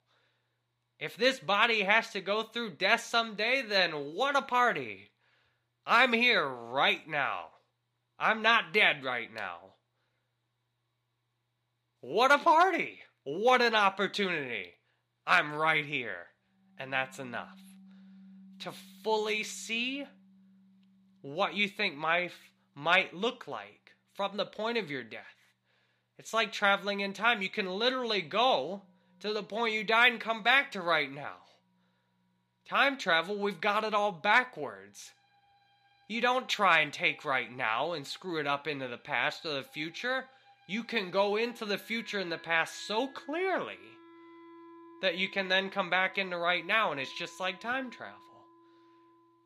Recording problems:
thin; very slightly; fading below 350 Hz
background music; faint; from 17 s on; 30 dB below the speech

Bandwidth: 15 kHz